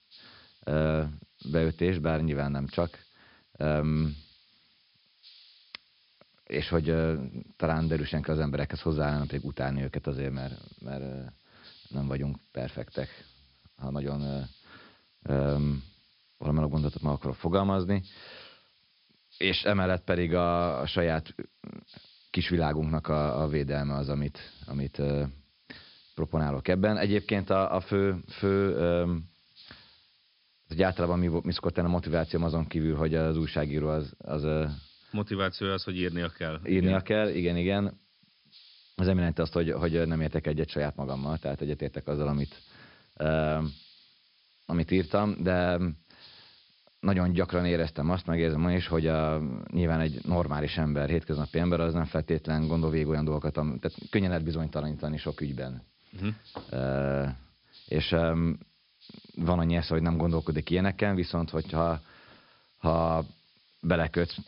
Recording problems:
high frequencies cut off; noticeable; nothing above 5.5 kHz
hiss; faint; throughout; 25 dB below the speech

